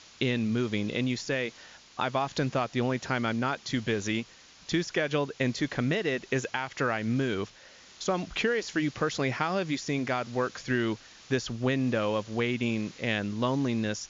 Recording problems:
high frequencies cut off; noticeable; nothing above 7 kHz
hiss; faint; throughout; 20 dB below the speech

